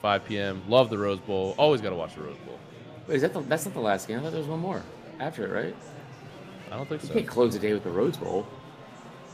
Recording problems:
murmuring crowd; noticeable; throughout; 15 dB below the speech

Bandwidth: 15 kHz